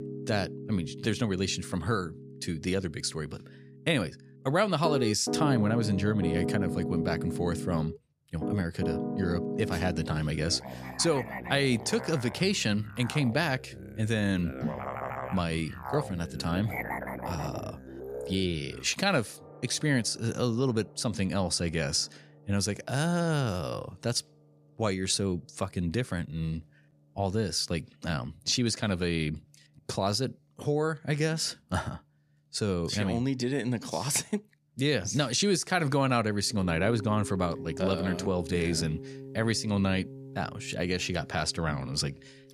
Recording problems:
background music; loud; throughout; 8 dB below the speech

